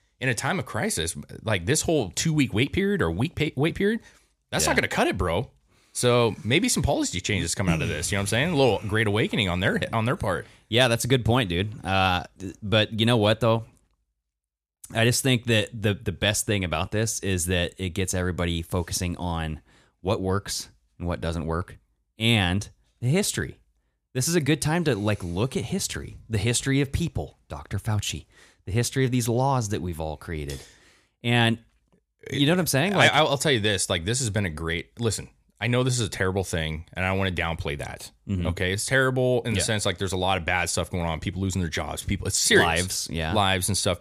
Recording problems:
none

